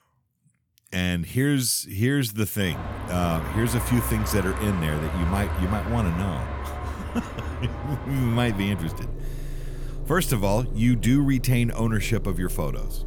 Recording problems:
traffic noise; loud; from 2.5 s on; 8 dB below the speech

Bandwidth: 18.5 kHz